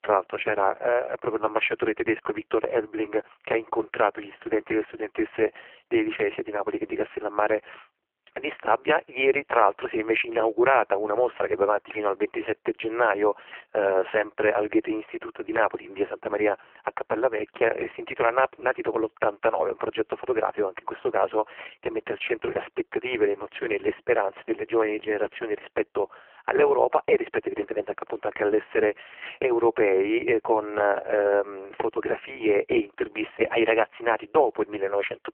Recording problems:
phone-call audio; poor line

